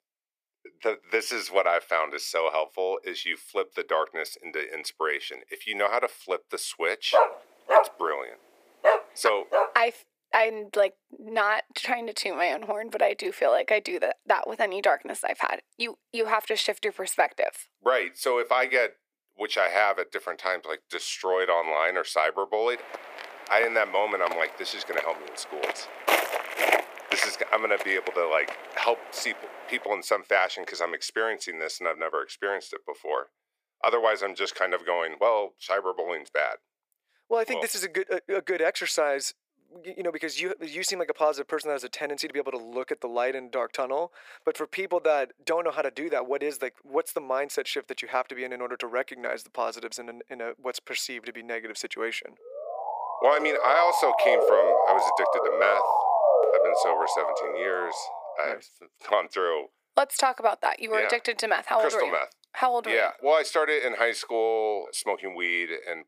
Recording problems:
thin; very; fading below 400 Hz
dog barking; loud; from 7 to 9.5 s; peak 6 dB above the speech
footsteps; loud; from 23 to 29 s; peak 4 dB above the speech
siren; loud; from 53 to 58 s; peak 7 dB above the speech

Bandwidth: 15 kHz